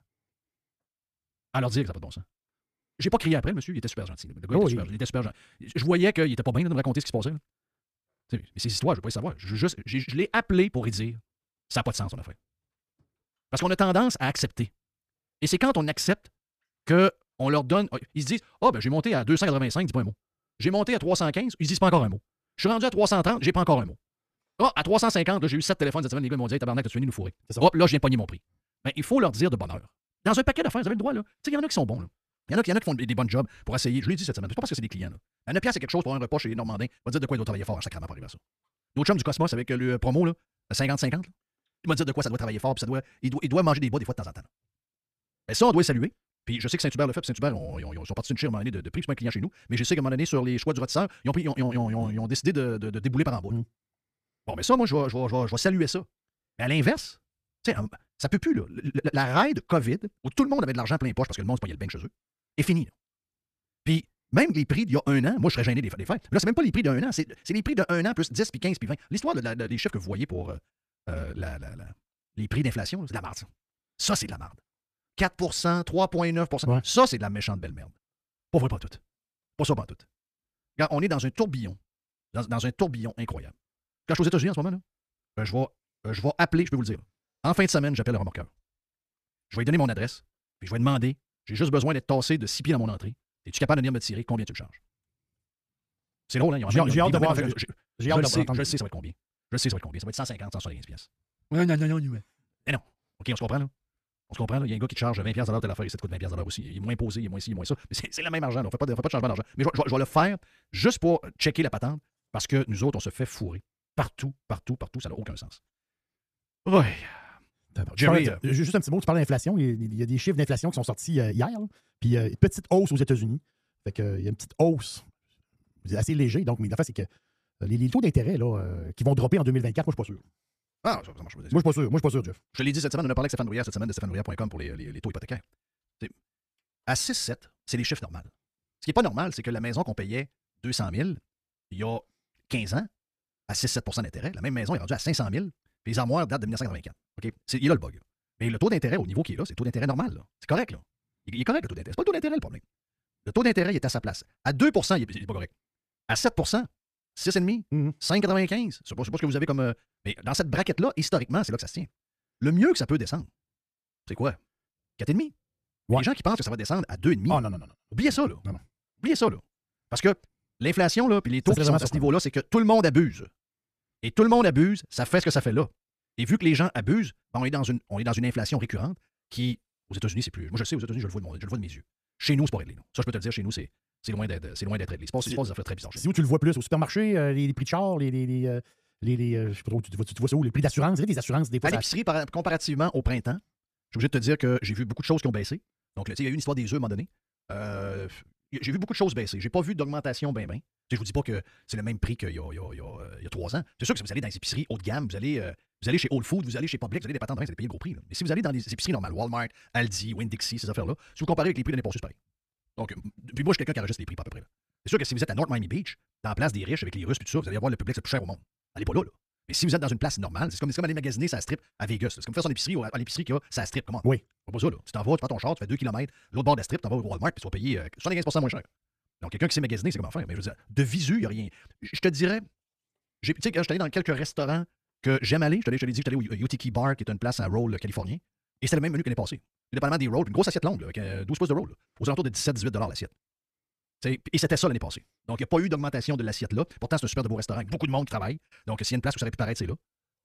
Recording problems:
wrong speed, natural pitch; too fast; 1.6 times normal speed

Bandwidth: 14.5 kHz